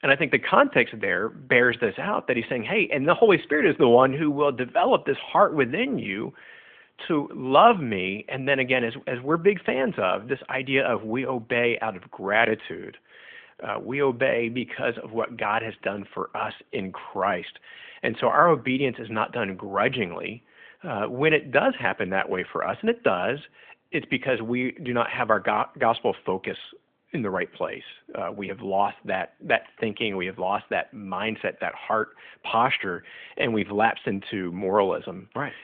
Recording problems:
phone-call audio

